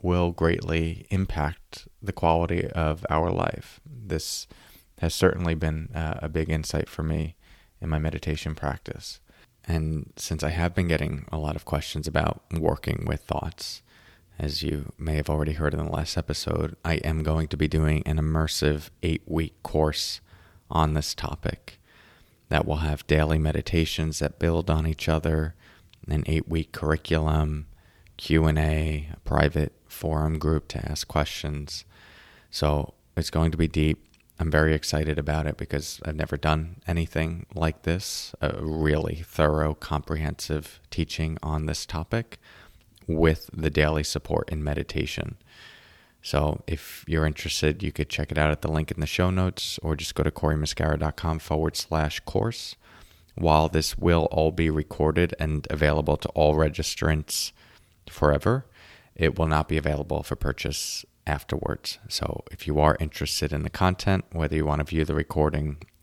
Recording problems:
none

